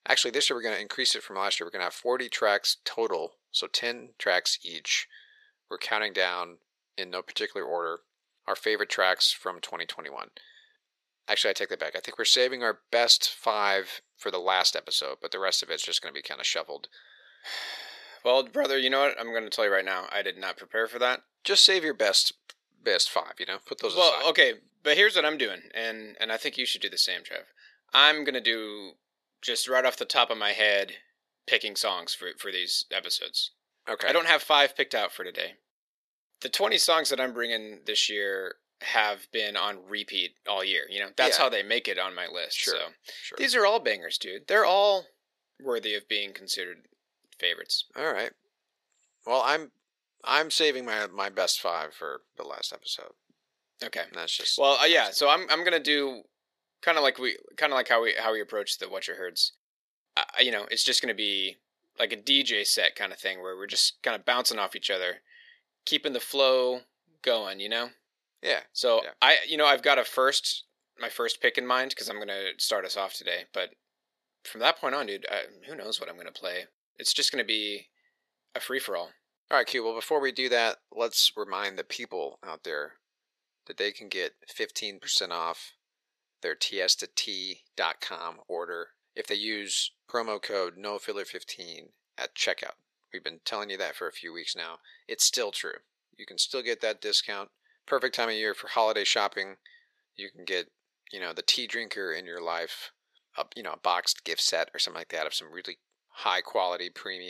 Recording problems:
thin; very; fading below 450 Hz
abrupt cut into speech; at the end

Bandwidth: 13.5 kHz